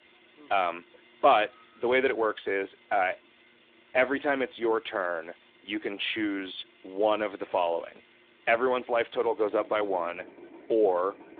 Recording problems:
phone-call audio
machinery noise; faint; throughout; 25 dB below the speech

